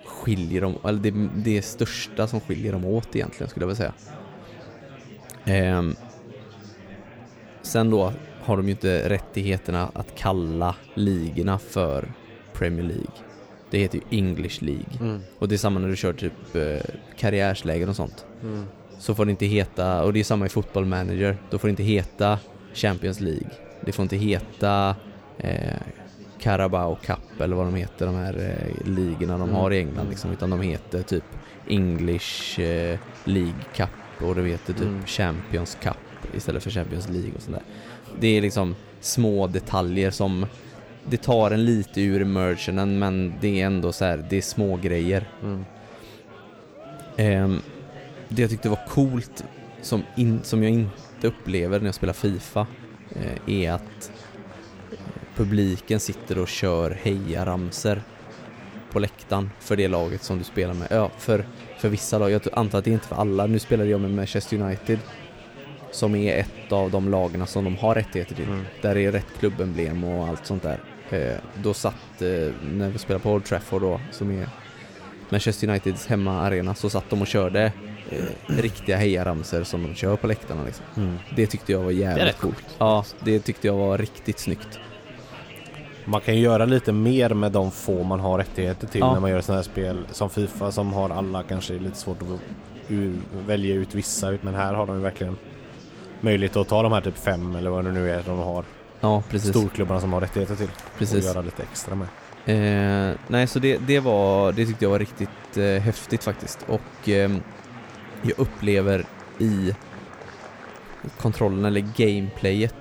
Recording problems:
murmuring crowd; noticeable; throughout; 15 dB below the speech

